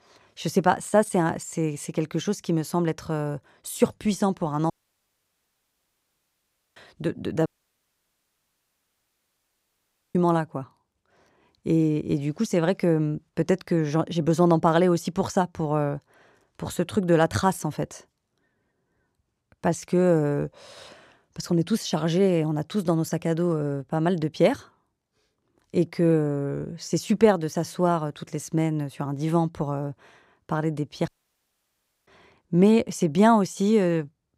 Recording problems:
audio cutting out; at 4.5 s for 2 s, at 7.5 s for 2.5 s and at 31 s for 1 s

